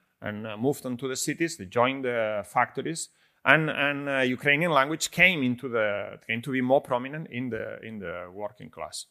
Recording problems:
none

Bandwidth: 15 kHz